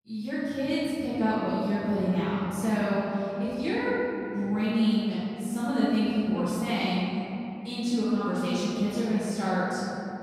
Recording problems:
room echo; strong; dies away in 3 s
off-mic speech; far

